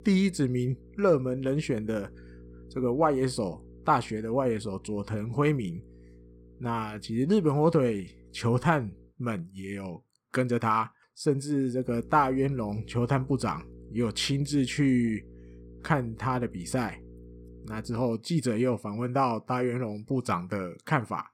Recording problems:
electrical hum; faint; until 9 s and from 12 to 18 s; 60 Hz, 25 dB below the speech

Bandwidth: 16 kHz